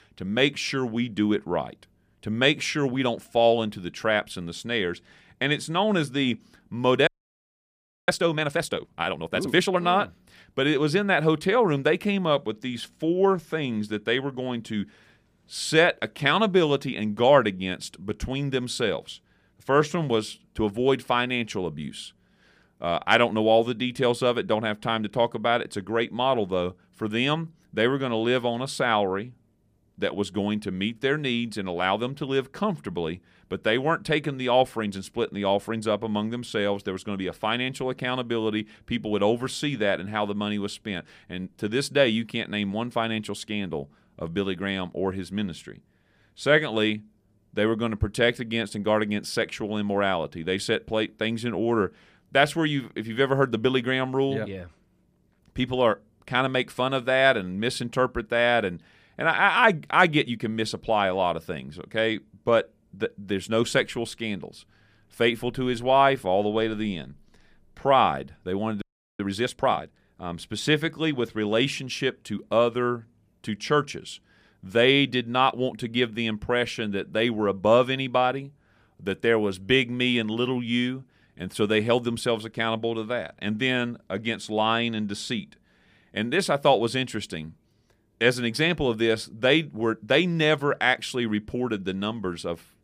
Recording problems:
audio freezing; at 7 s for 1 s and at 1:09

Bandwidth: 15 kHz